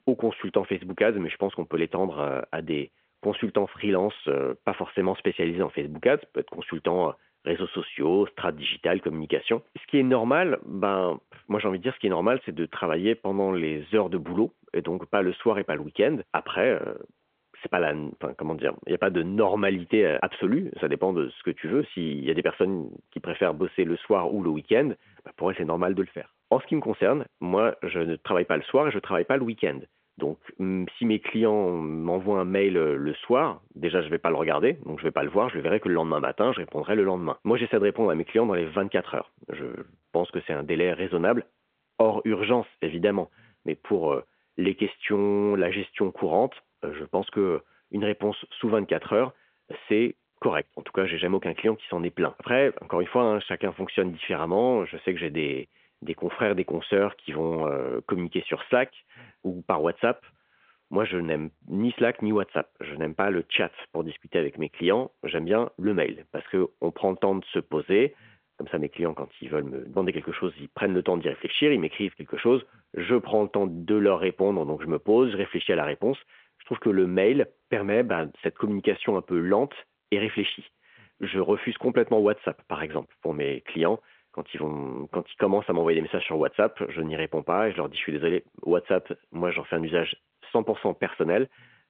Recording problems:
phone-call audio; nothing above 3.5 kHz

